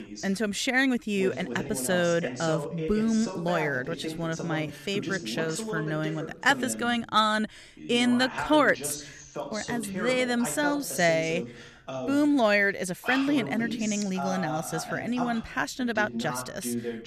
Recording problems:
voice in the background; loud; throughout; 9 dB below the speech

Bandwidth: 14 kHz